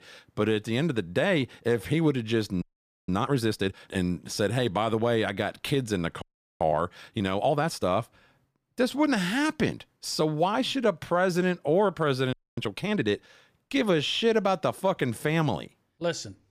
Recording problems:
audio freezing; at 2.5 s, at 6 s and at 12 s

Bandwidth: 15 kHz